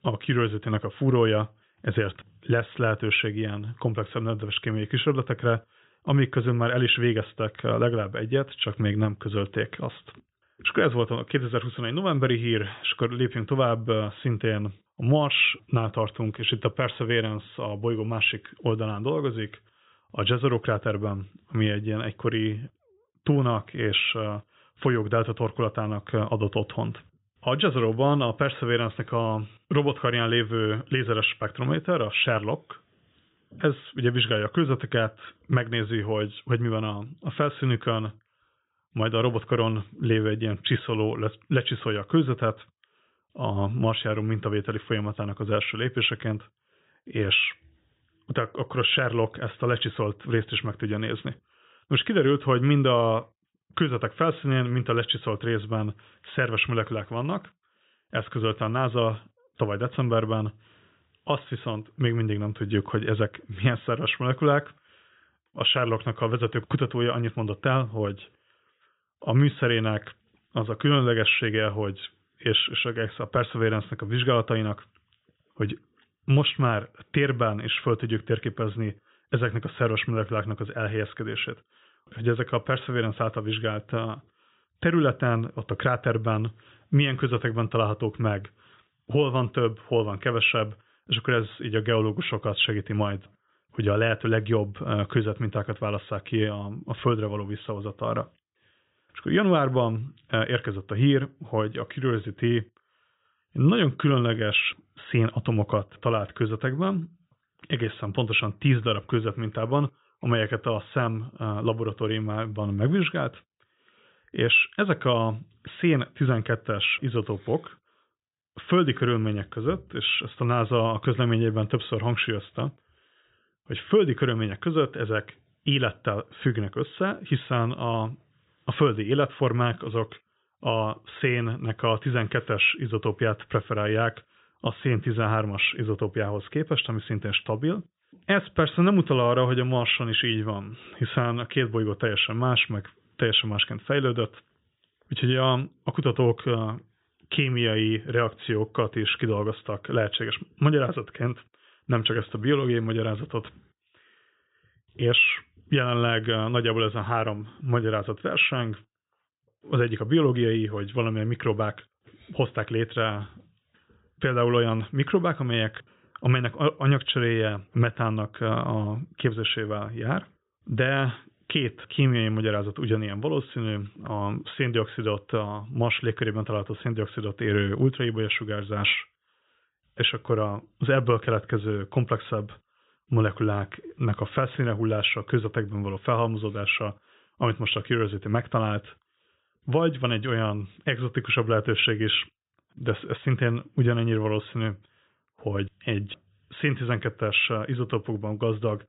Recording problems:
high frequencies cut off; severe; nothing above 4 kHz

